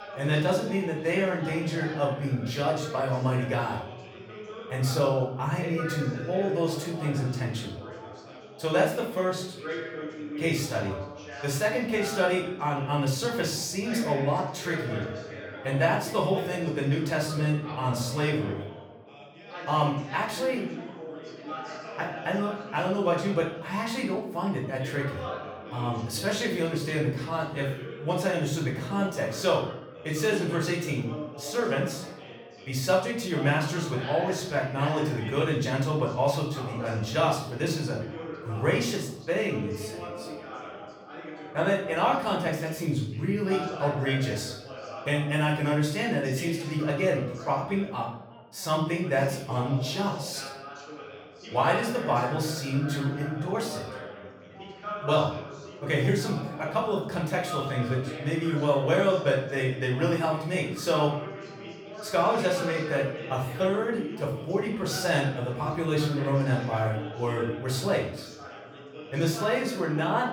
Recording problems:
off-mic speech; far
room echo; noticeable; dies away in 0.6 s
background chatter; noticeable; throughout; 3 voices, 10 dB below the speech

